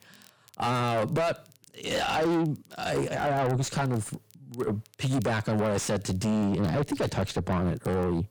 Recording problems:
distortion; heavy; 6 dB below the speech
crackle, like an old record; faint; 30 dB below the speech

